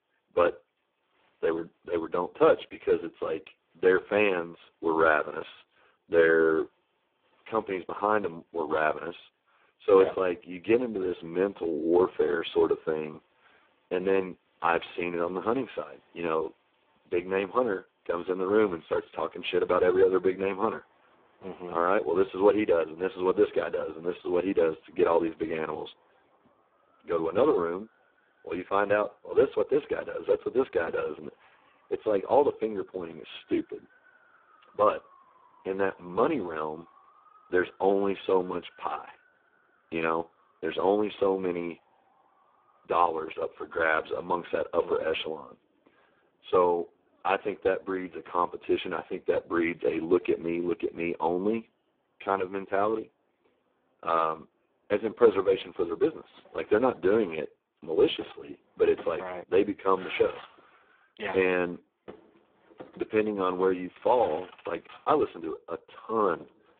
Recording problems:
phone-call audio; poor line
traffic noise; faint; throughout; 30 dB below the speech

